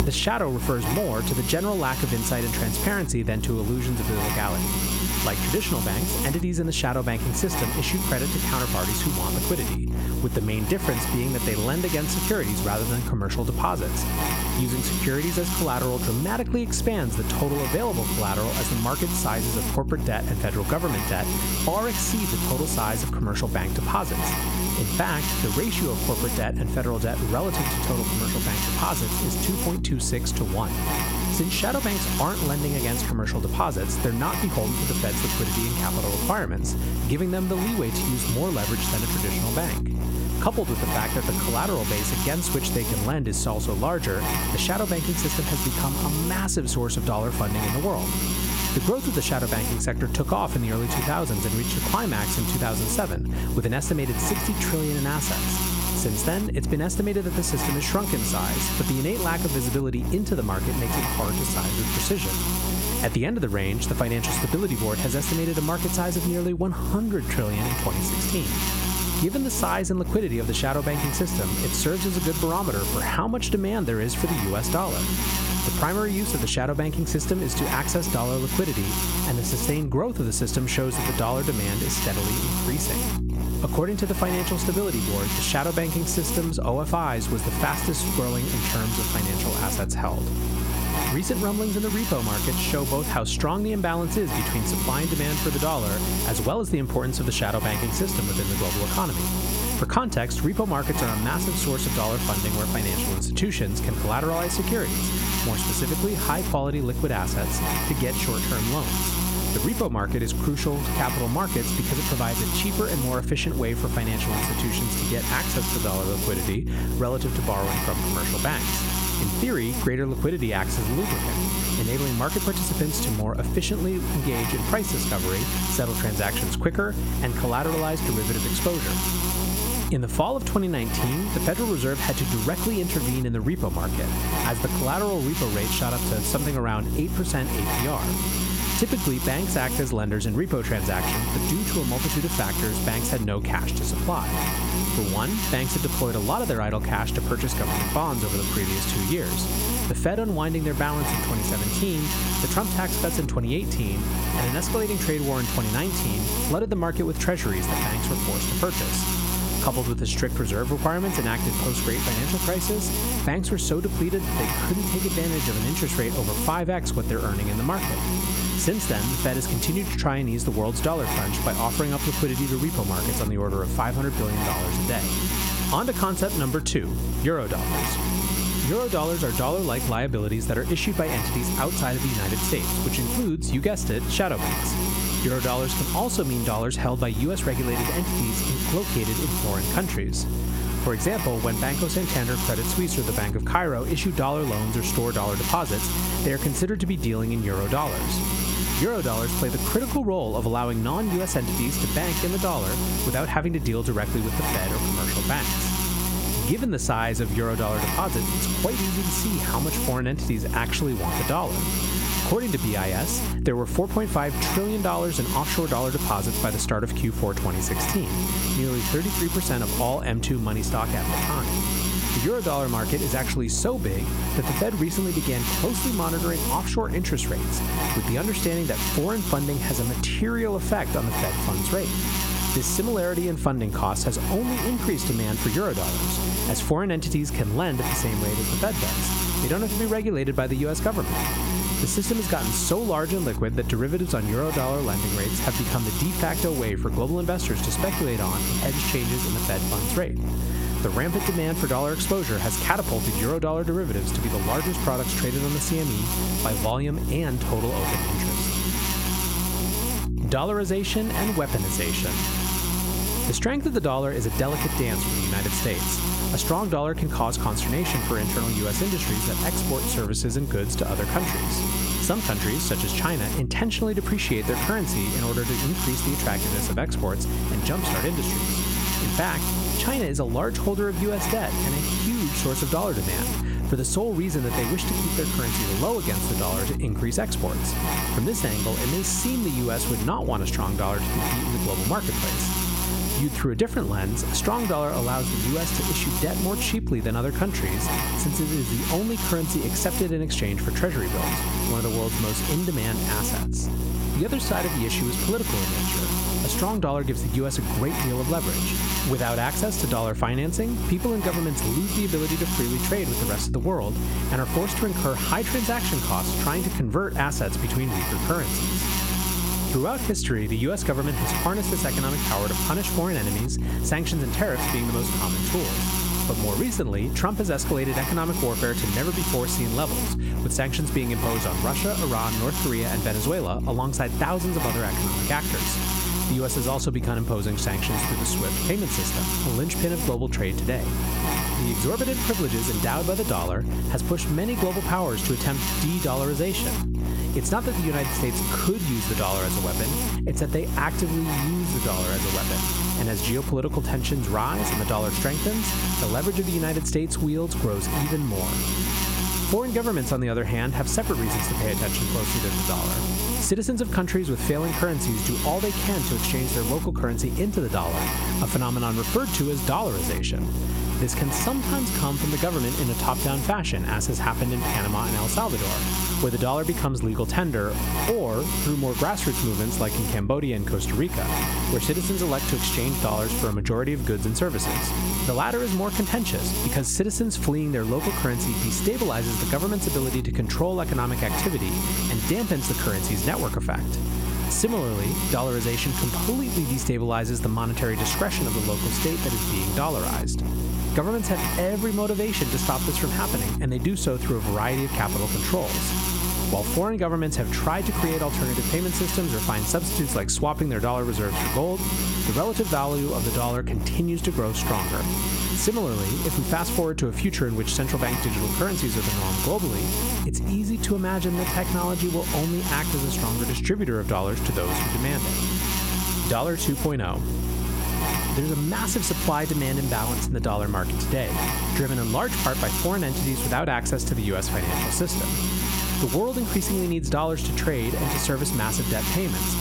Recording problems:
squashed, flat; somewhat
electrical hum; loud; throughout; 60 Hz, 2 dB below the speech

